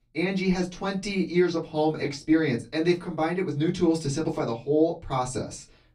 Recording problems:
off-mic speech; far
room echo; very slight; dies away in 0.2 s

